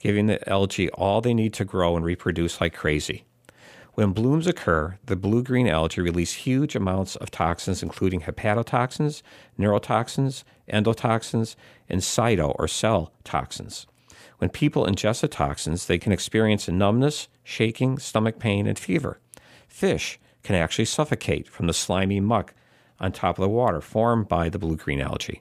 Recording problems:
none

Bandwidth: 15 kHz